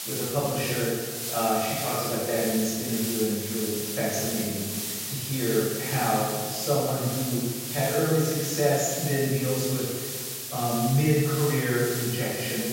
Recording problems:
room echo; strong; dies away in 1.4 s
off-mic speech; far
high frequencies cut off; noticeable; nothing above 7.5 kHz
hiss; loud; throughout; 4 dB below the speech

